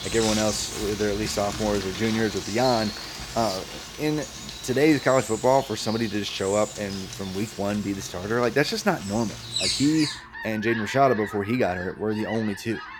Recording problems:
animal sounds; loud; throughout; 7 dB below the speech

